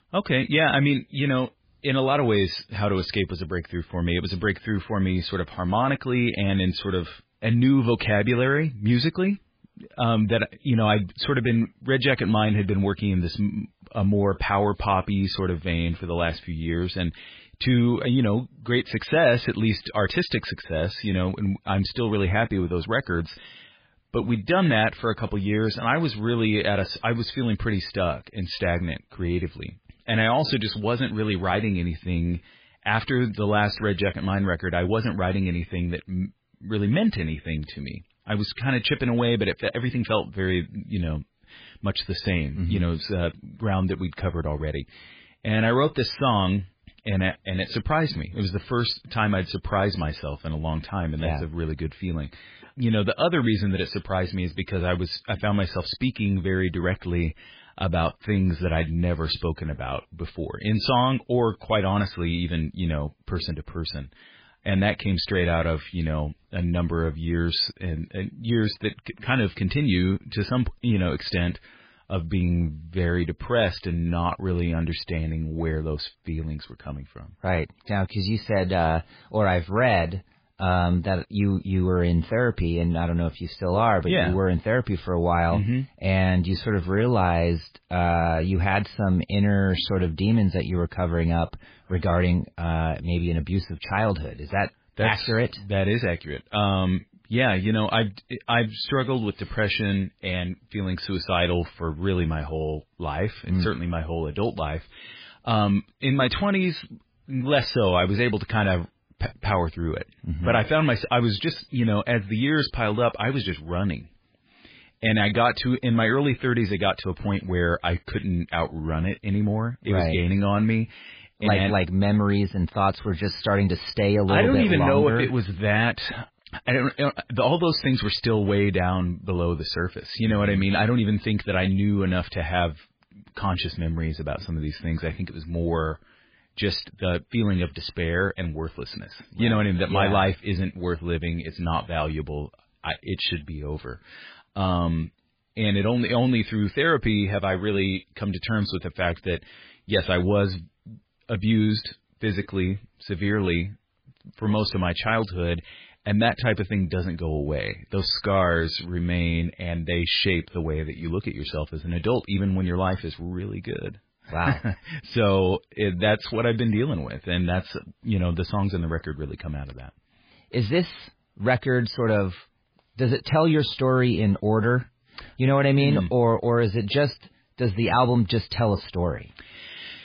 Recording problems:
garbled, watery; badly

